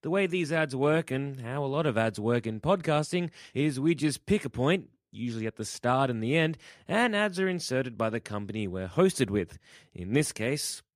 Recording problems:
none

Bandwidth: 15 kHz